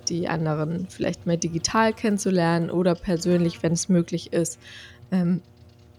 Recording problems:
electrical hum; faint; throughout; 60 Hz, 25 dB below the speech

